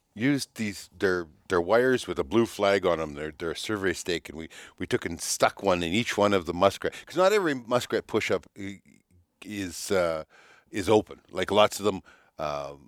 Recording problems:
none

